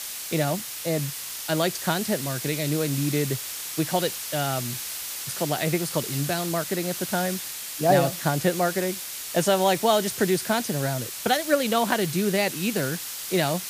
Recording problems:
hiss; loud; throughout; 6 dB below the speech

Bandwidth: 15 kHz